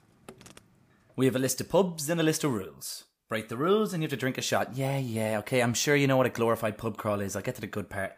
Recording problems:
animal sounds; faint; until 2 s; 30 dB below the speech

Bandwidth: 15 kHz